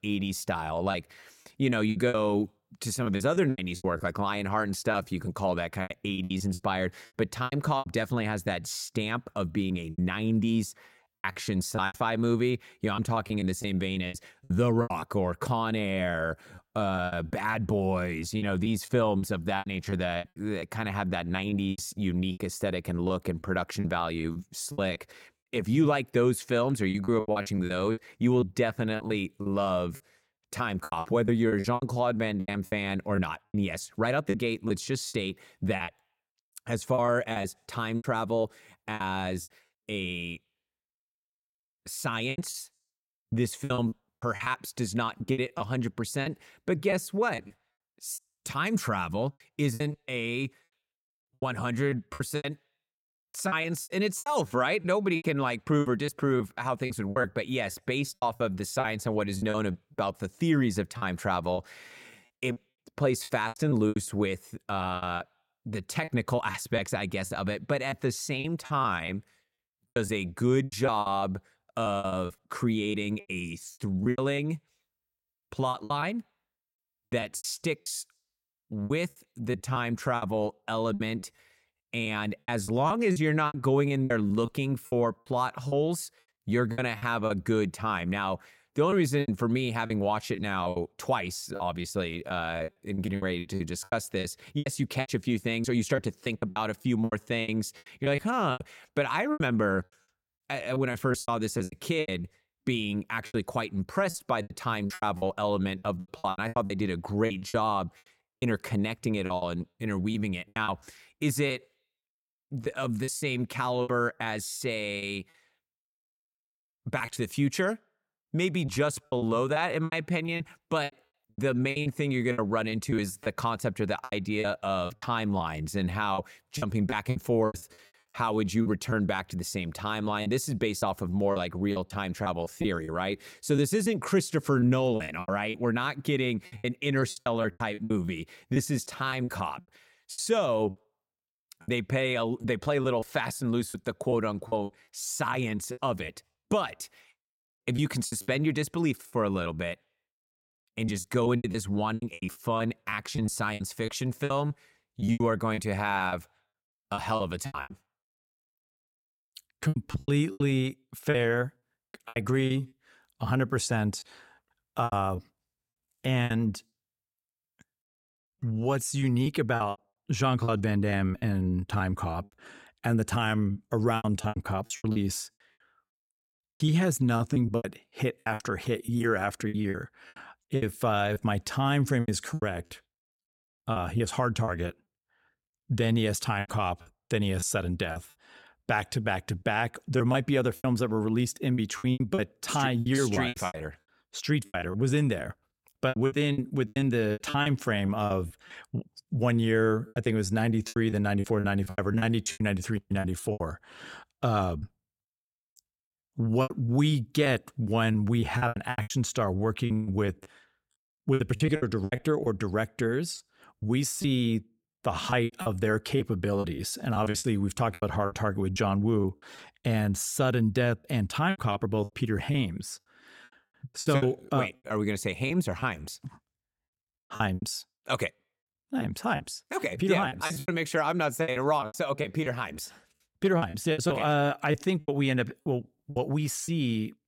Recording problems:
choppy; very; 13% of the speech affected

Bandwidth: 16.5 kHz